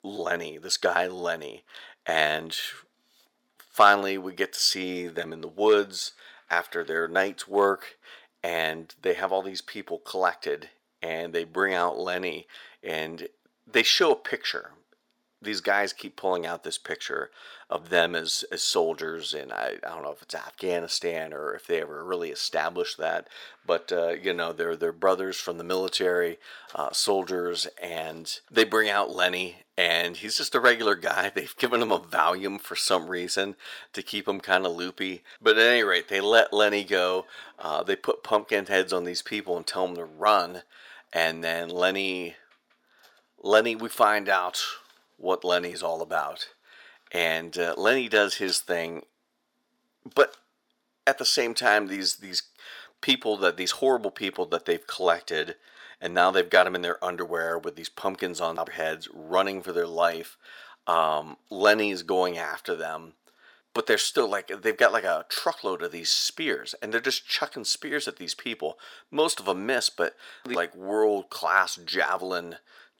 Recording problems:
thin; very; fading below 550 Hz

